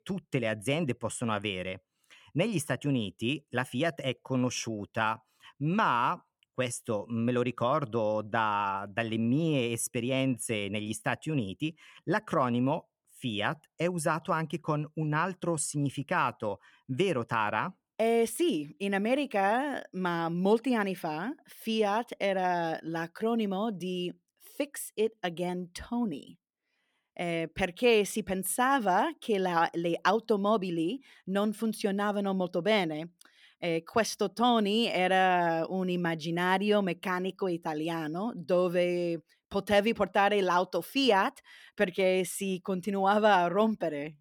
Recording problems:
none

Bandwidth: 18 kHz